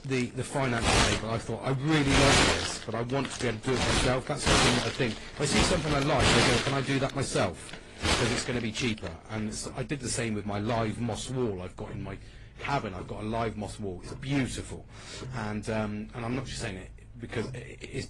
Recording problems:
distortion; heavy; 6% of the sound clipped
garbled, watery; slightly; nothing above 10 kHz
household noises; very loud; throughout; 4 dB above the speech

